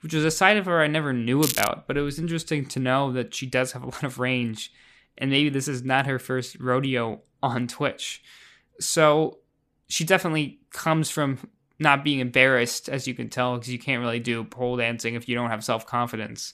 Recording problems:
crackling; loud; at 1.5 s; 4 dB below the speech

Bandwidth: 14.5 kHz